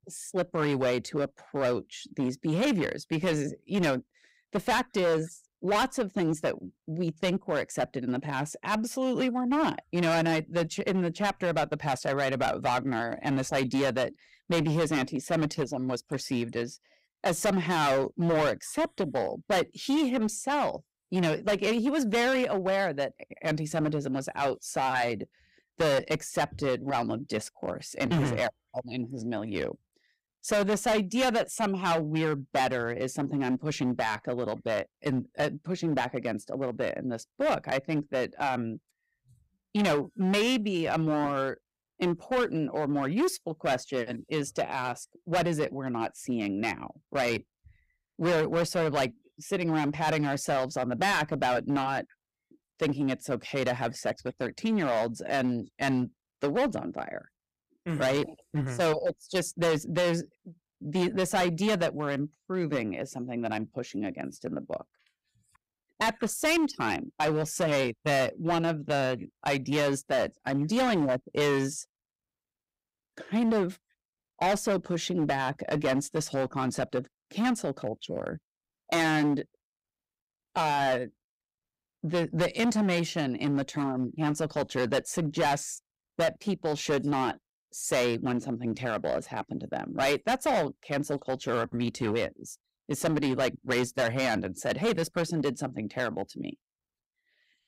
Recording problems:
distortion; heavy; 10% of the sound clipped

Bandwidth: 15.5 kHz